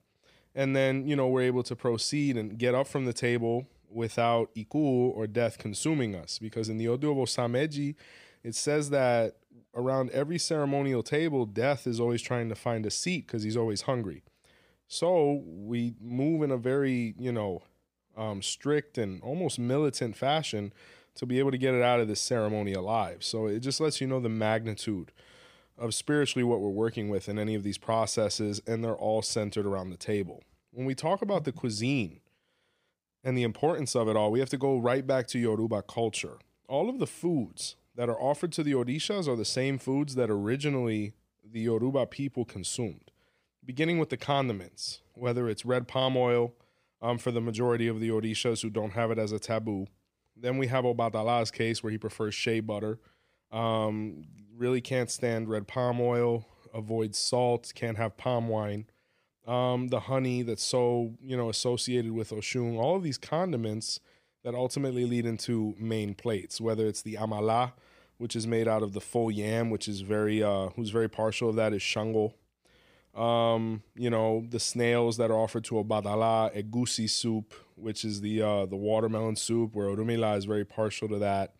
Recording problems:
none

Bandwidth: 15 kHz